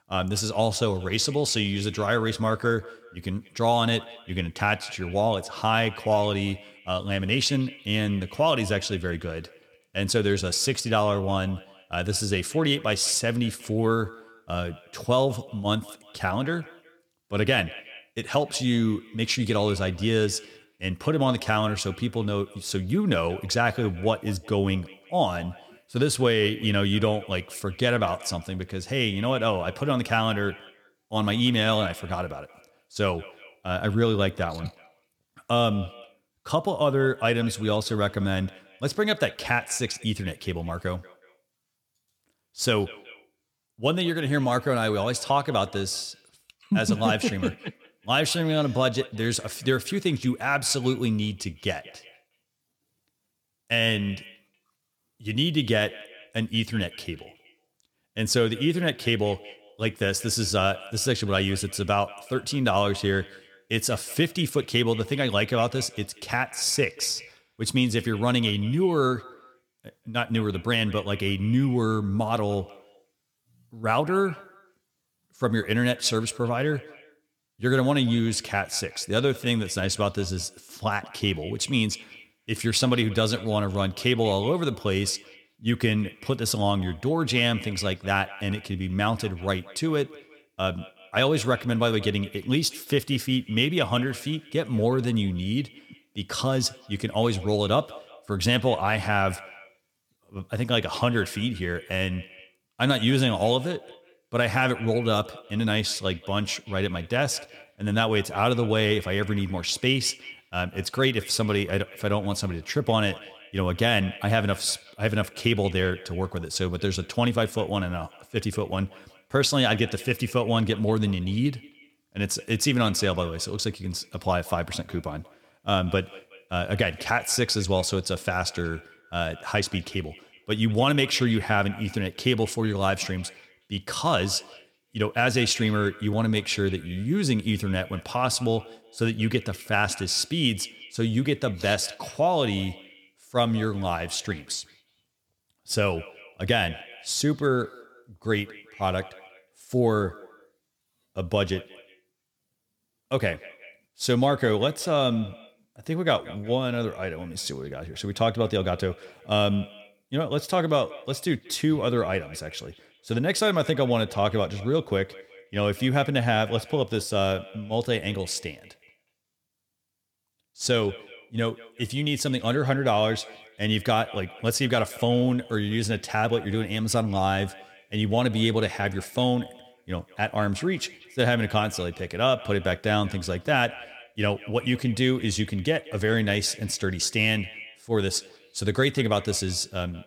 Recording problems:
echo of what is said; faint; throughout; 180 ms later, 20 dB below the speech

